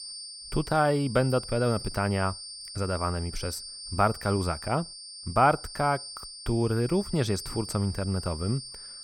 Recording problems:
high-pitched whine; noticeable; throughout; 4.5 kHz, 10 dB below the speech

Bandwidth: 17 kHz